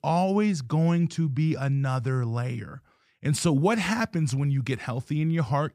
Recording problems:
none

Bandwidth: 14.5 kHz